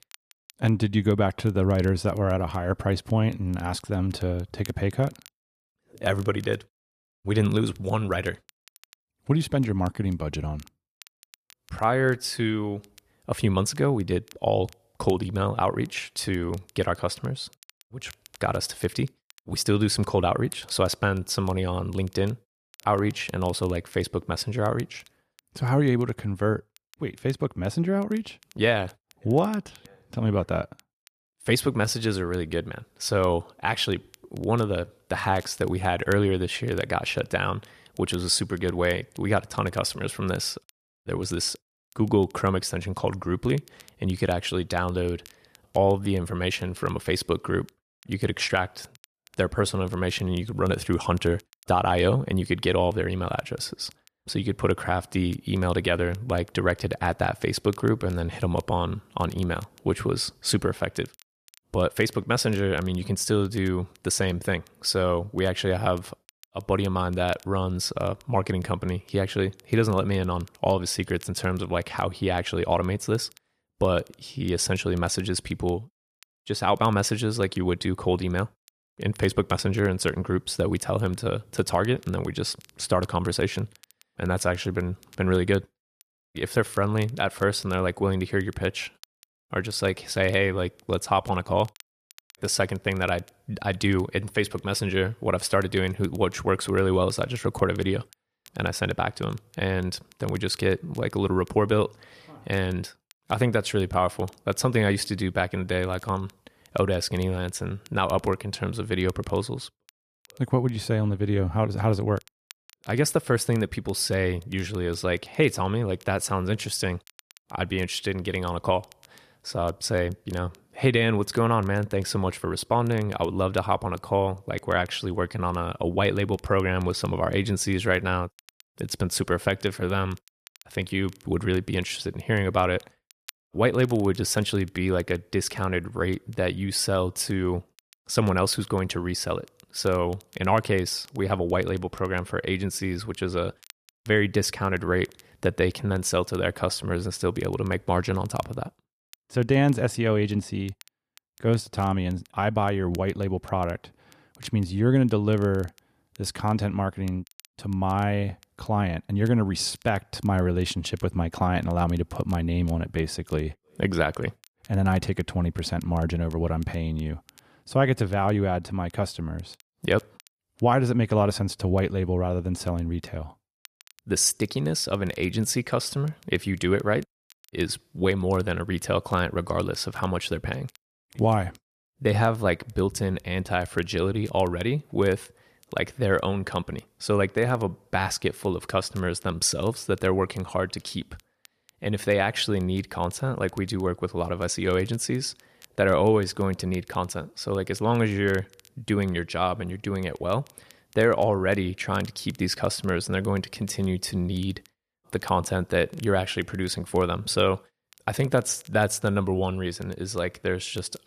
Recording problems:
crackle, like an old record; faint; 30 dB below the speech

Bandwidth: 14.5 kHz